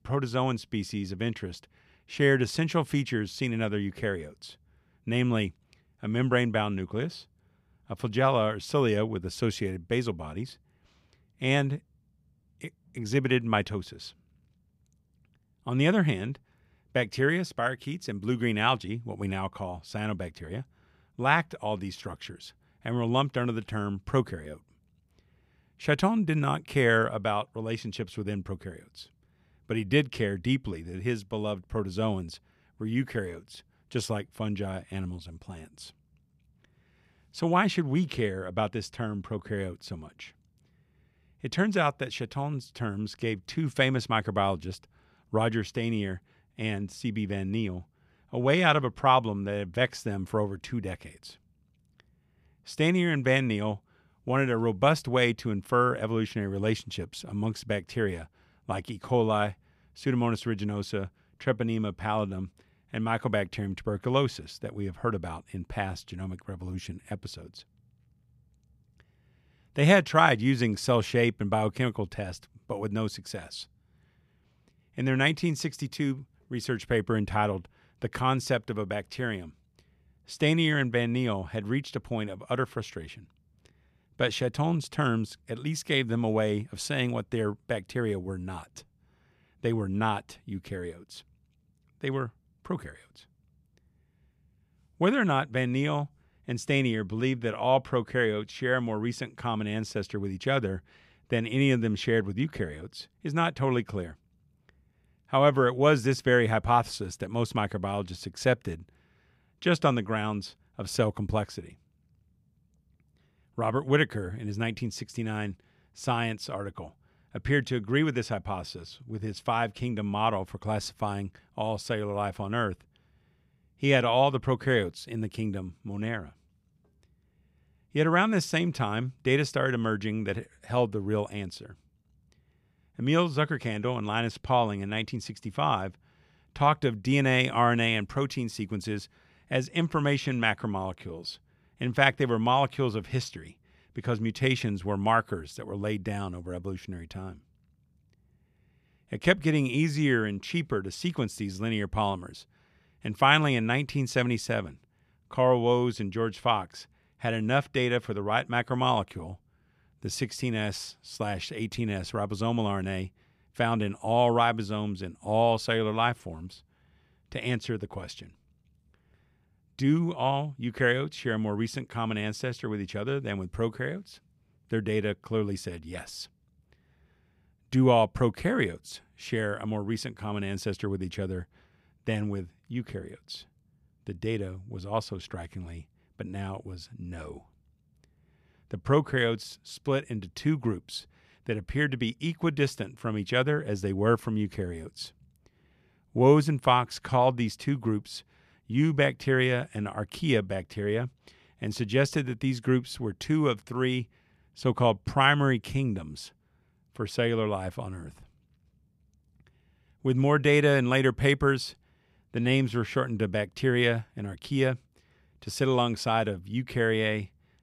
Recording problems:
none

